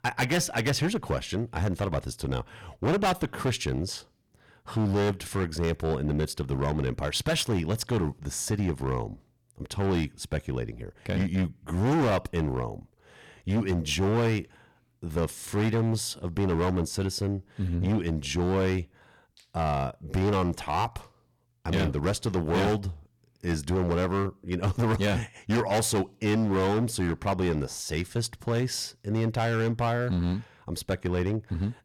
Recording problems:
distortion; heavy; 12% of the sound clipped

